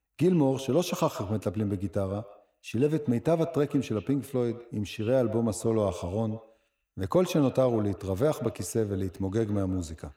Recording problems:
echo of what is said; noticeable; throughout; 130 ms later, 15 dB below the speech

